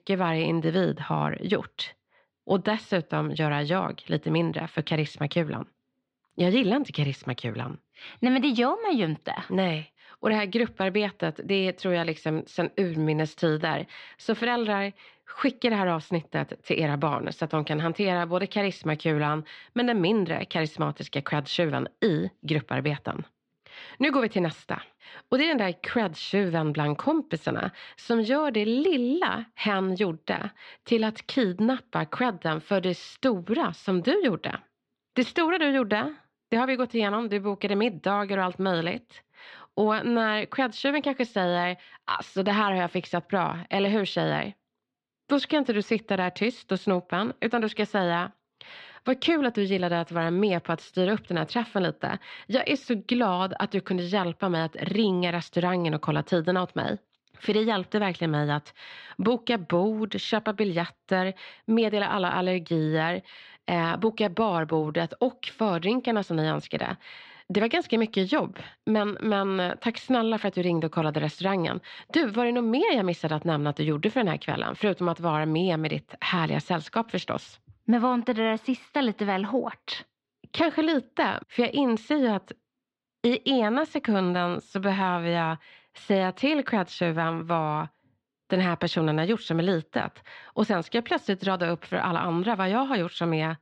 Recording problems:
muffled; slightly; fading above 3.5 kHz

